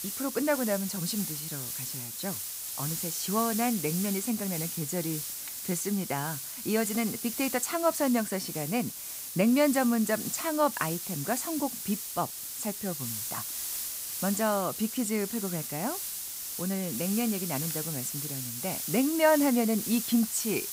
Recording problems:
hiss; loud; throughout; 4 dB below the speech

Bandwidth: 15.5 kHz